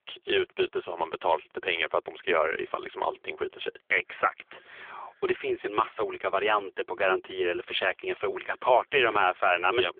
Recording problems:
phone-call audio; poor line; nothing above 3.5 kHz

